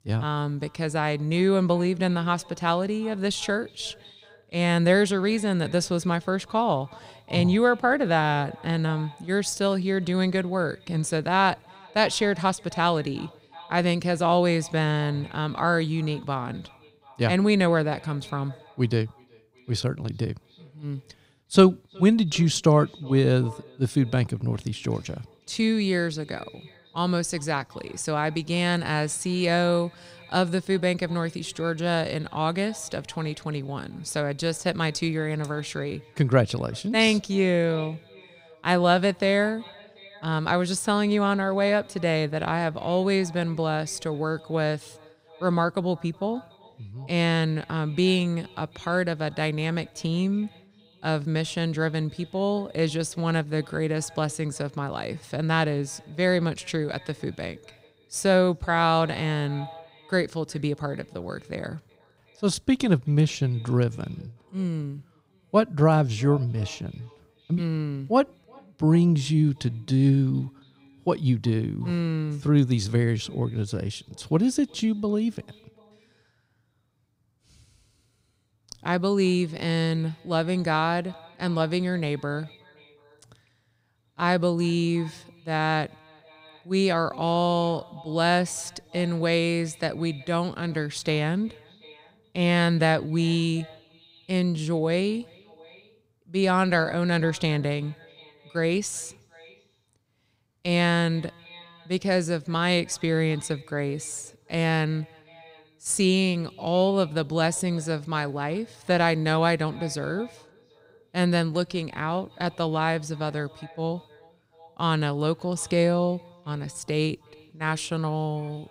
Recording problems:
echo of what is said; faint; throughout; 370 ms later, 25 dB below the speech

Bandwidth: 15.5 kHz